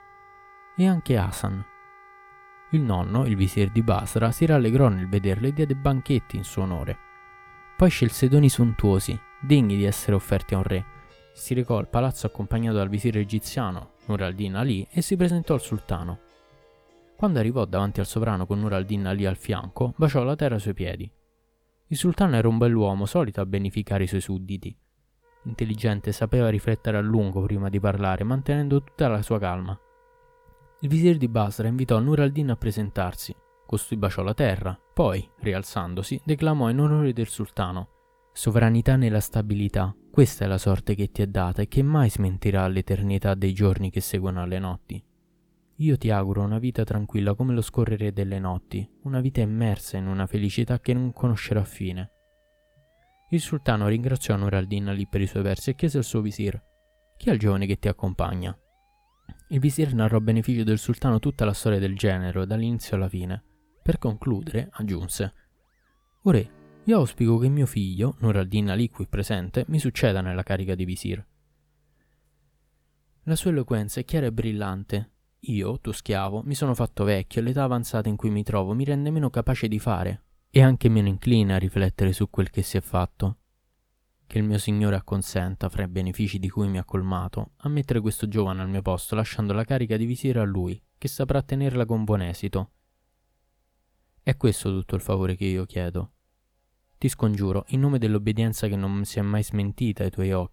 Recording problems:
background music; faint; throughout; 30 dB below the speech

